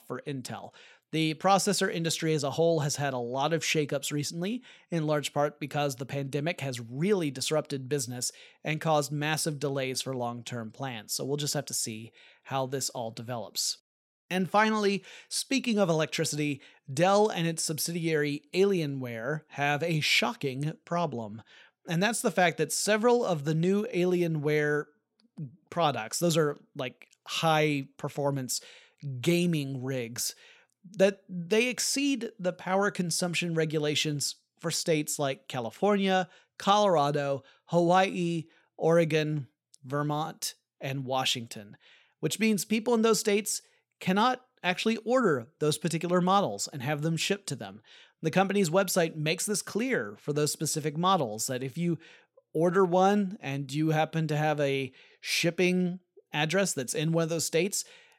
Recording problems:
none

